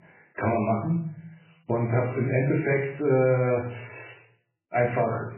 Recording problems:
garbled, watery; badly
room echo; slight; dies away in 0.5 s
off-mic speech; somewhat distant

